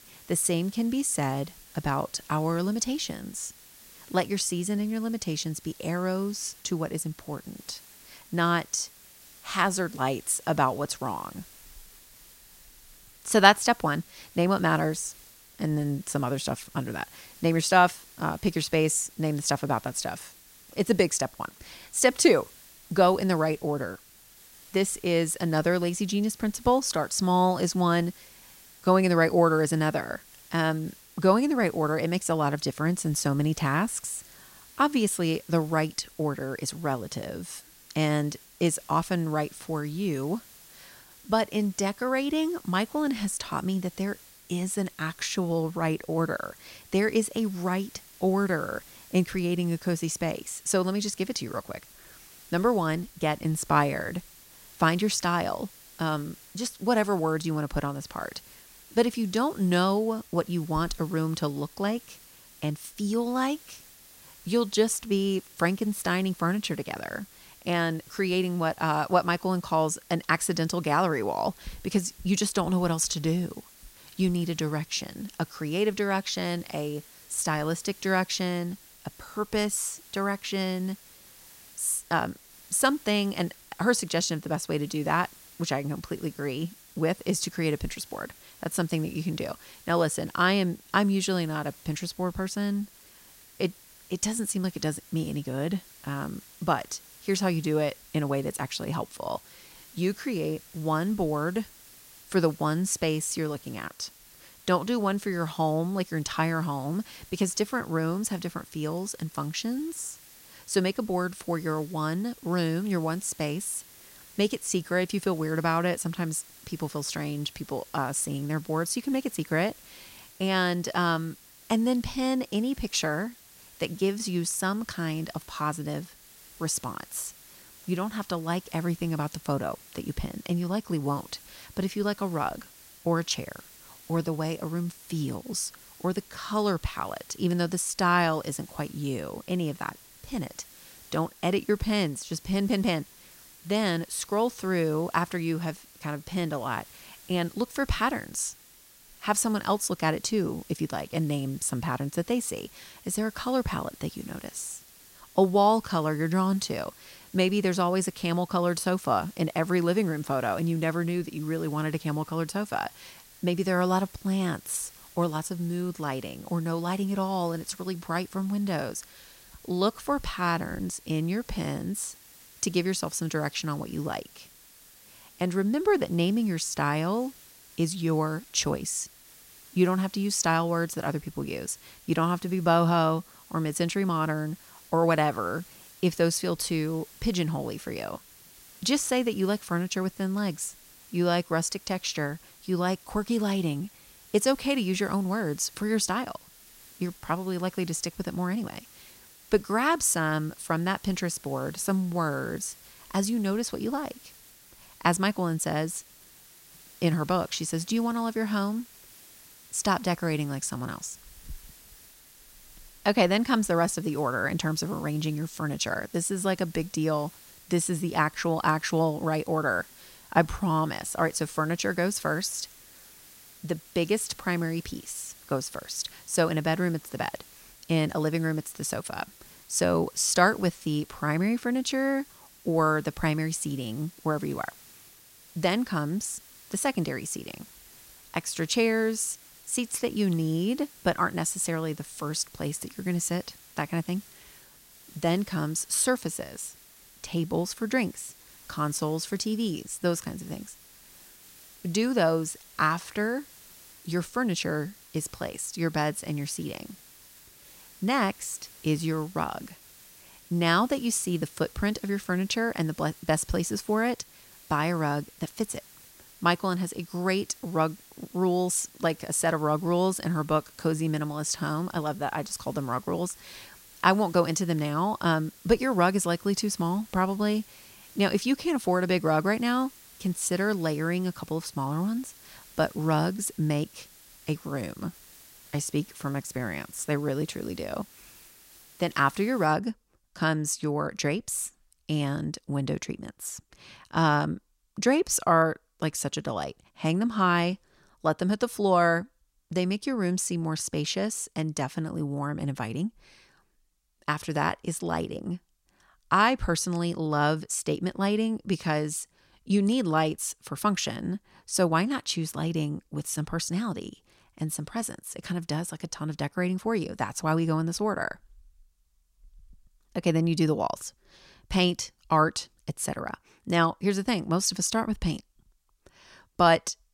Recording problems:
hiss; faint; until 4:50; 20 dB below the speech

